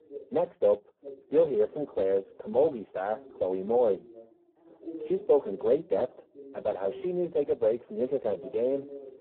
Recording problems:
phone-call audio; poor line
muffled; very; fading above 1 kHz
background chatter; noticeable; throughout; 2 voices, 20 dB below the speech

